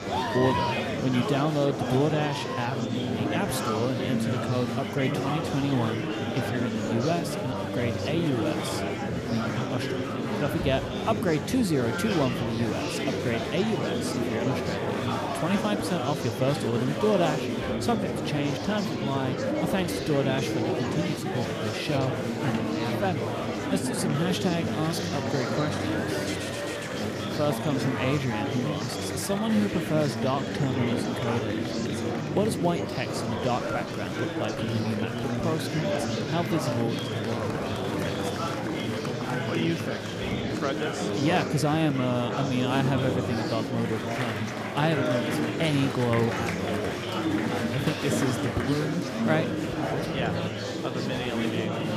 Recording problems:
murmuring crowd; very loud; throughout; as loud as the speech

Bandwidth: 14.5 kHz